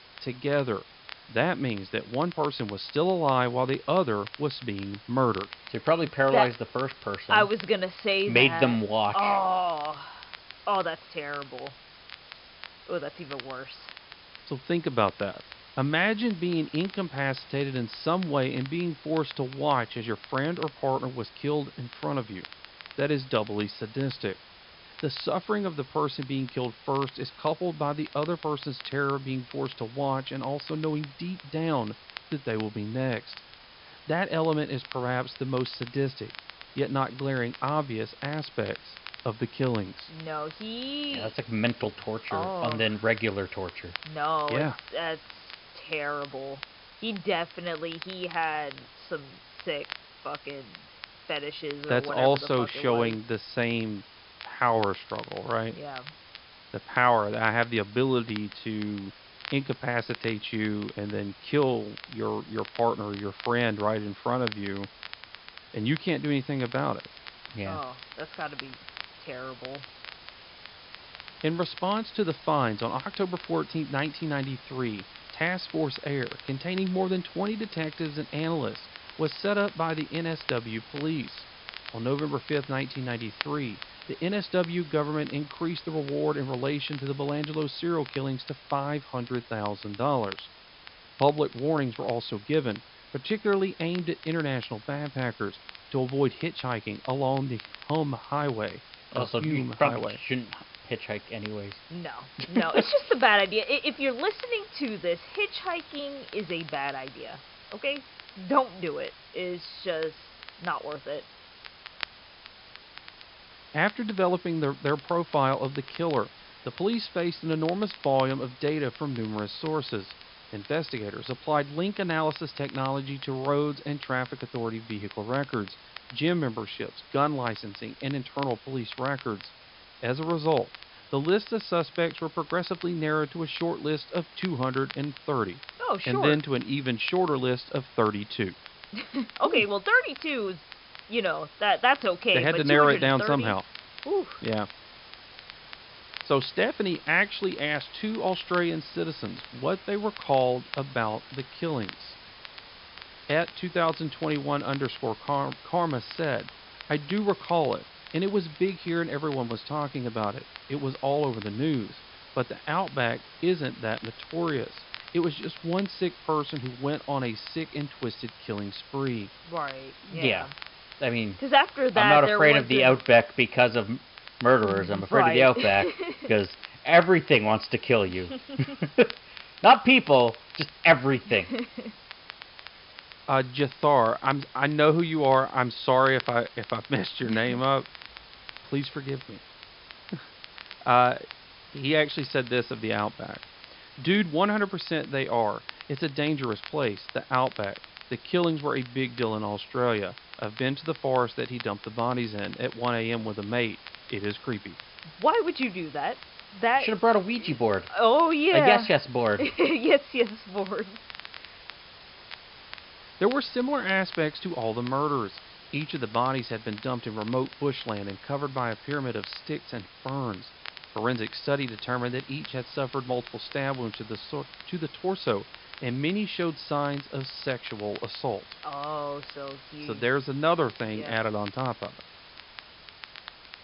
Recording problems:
high frequencies cut off; noticeable; nothing above 5.5 kHz
crackle, like an old record; noticeable; 20 dB below the speech
hiss; faint; throughout; 20 dB below the speech

